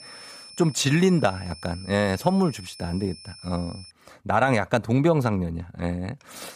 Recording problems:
high-pitched whine; noticeable; until 4 s; 5.5 kHz, 20 dB below the speech

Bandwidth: 15 kHz